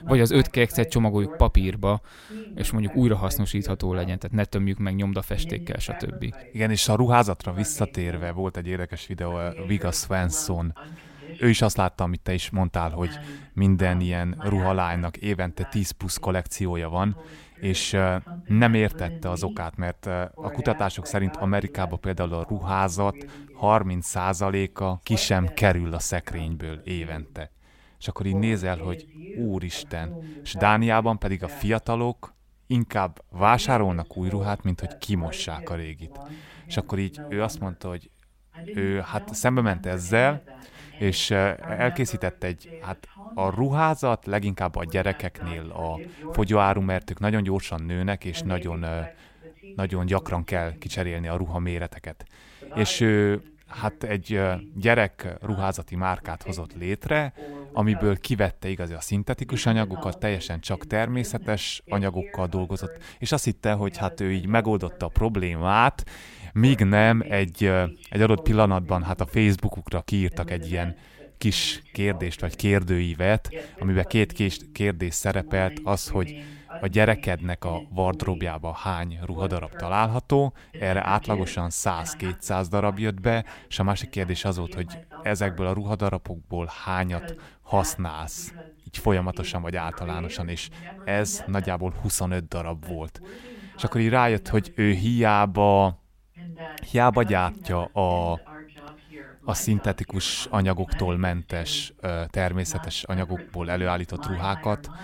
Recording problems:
voice in the background; noticeable; throughout; 15 dB below the speech

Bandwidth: 16 kHz